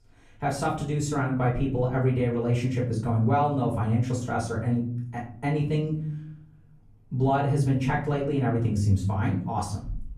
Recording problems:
off-mic speech; far
room echo; slight; dies away in 0.8 s

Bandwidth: 14.5 kHz